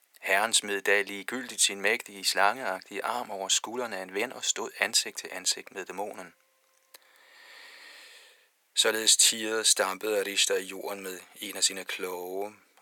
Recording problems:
thin; very; fading below 500 Hz

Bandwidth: 18 kHz